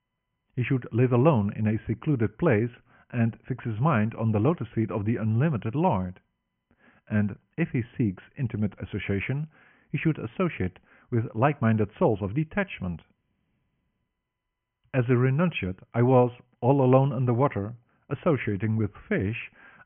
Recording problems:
high frequencies cut off; severe; nothing above 3 kHz

